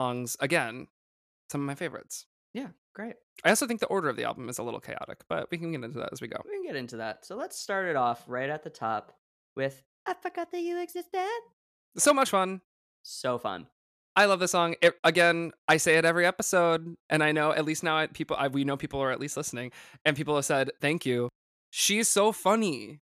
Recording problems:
abrupt cut into speech; at the start

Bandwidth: 14.5 kHz